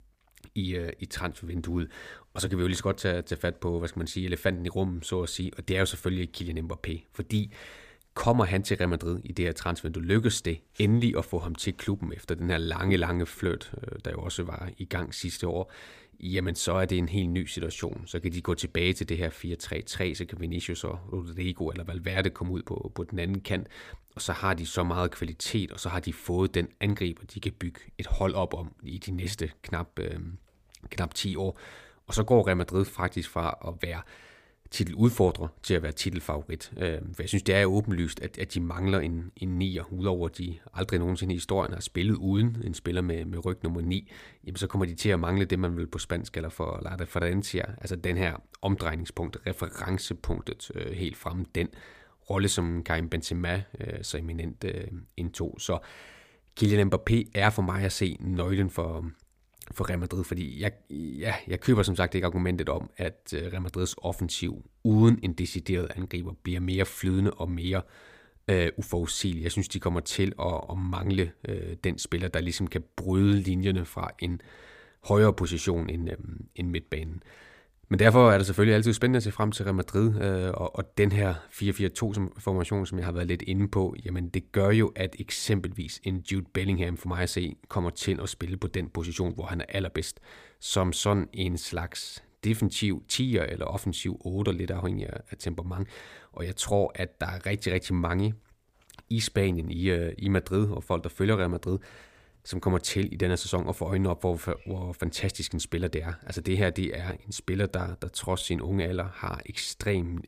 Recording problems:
none

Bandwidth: 15 kHz